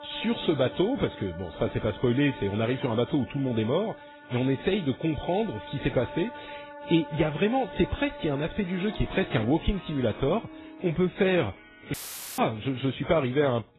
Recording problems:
garbled, watery; badly; nothing above 4 kHz
background music; noticeable; throughout; 15 dB below the speech
audio cutting out; filled with static; at 12 s

